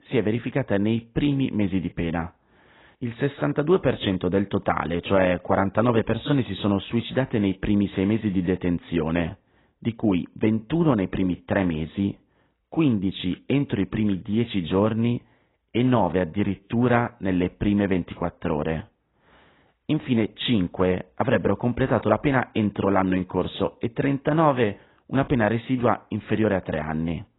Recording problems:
garbled, watery; badly; nothing above 4 kHz

